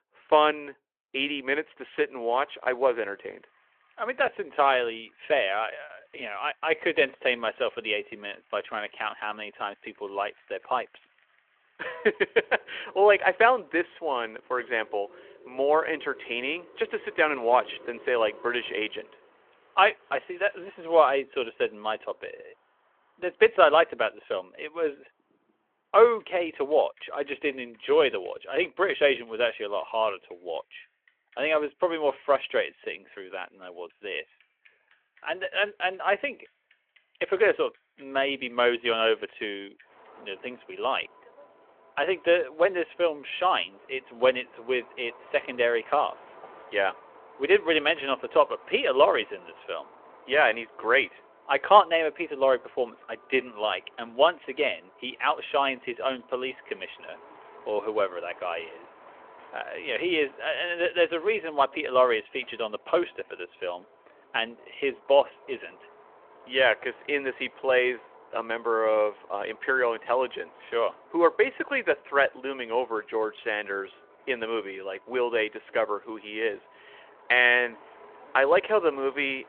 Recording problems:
phone-call audio; nothing above 3.5 kHz
traffic noise; faint; throughout; 25 dB below the speech

